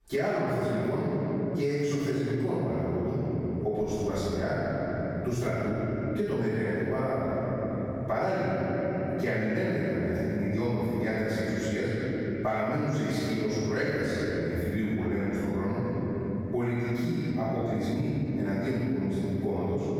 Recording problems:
room echo; strong; dies away in 3 s
off-mic speech; far
squashed, flat; somewhat

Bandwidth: 18 kHz